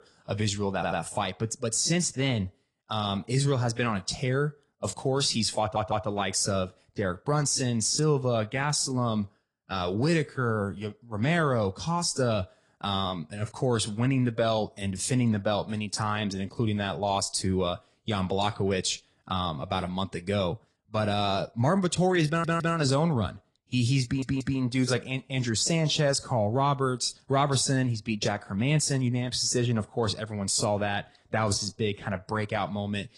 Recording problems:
garbled, watery; slightly
audio stuttering; 4 times, first at 1 s

